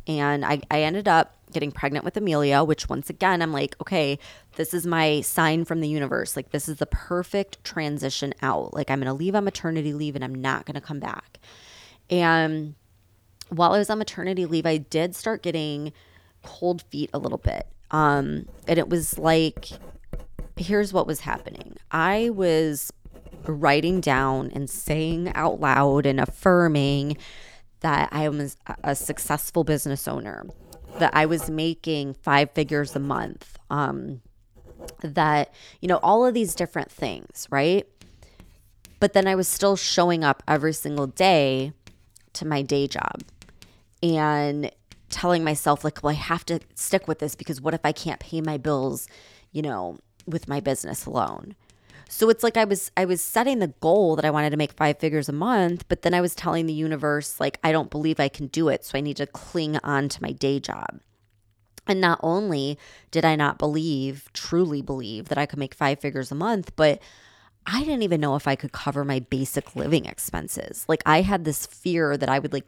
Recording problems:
household noises; faint; throughout; 25 dB below the speech

